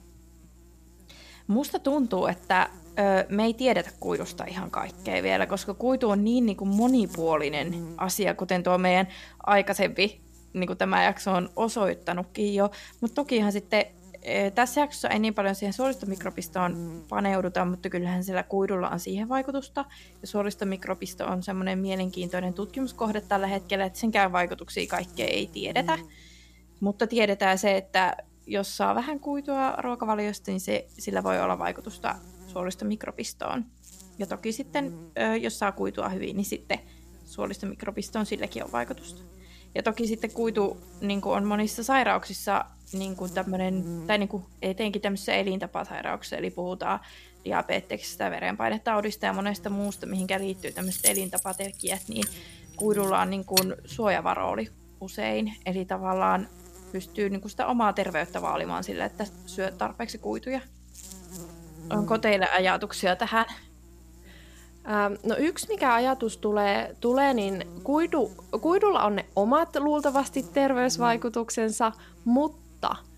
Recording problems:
electrical hum; faint; throughout; 60 Hz, 25 dB below the speech
jangling keys; loud; from 50 to 54 s; peak 4 dB above the speech

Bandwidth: 14.5 kHz